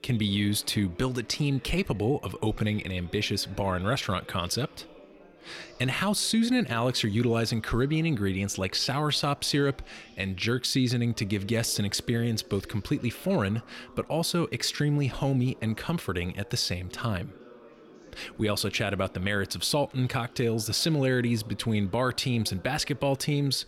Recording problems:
background chatter; faint; throughout; 3 voices, 25 dB below the speech

